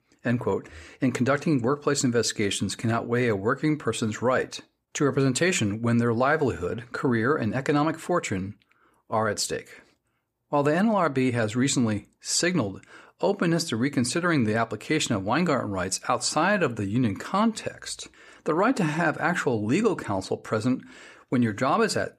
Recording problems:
none

